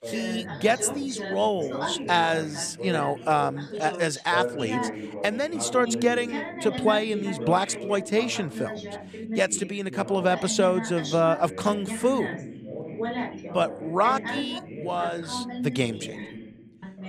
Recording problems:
background chatter; loud; throughout; 2 voices, 8 dB below the speech

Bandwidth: 14.5 kHz